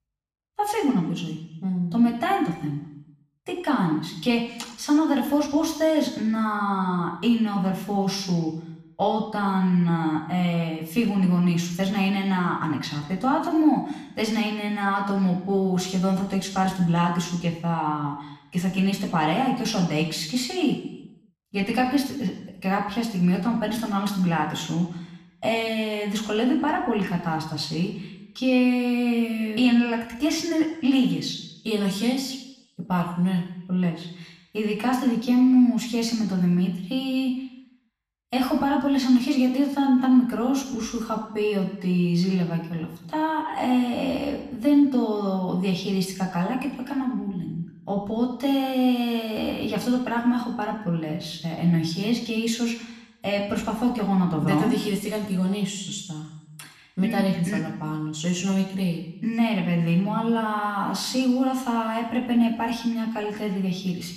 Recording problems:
room echo; noticeable; dies away in 0.8 s
off-mic speech; somewhat distant

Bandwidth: 14.5 kHz